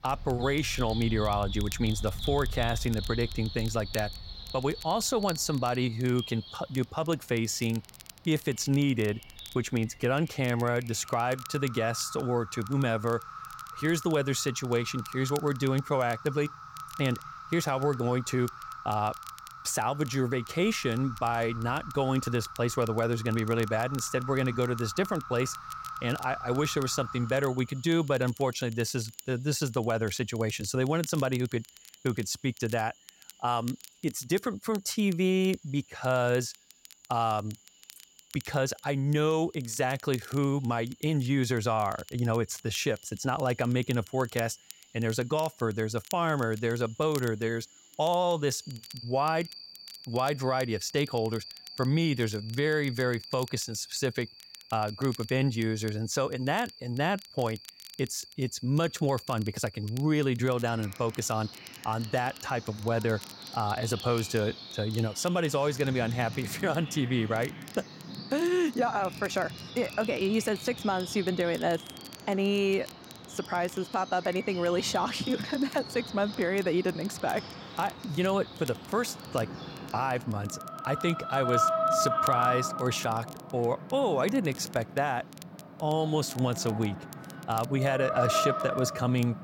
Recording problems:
animal sounds; loud; throughout; 9 dB below the speech
crackle, like an old record; faint; 20 dB below the speech

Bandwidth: 16 kHz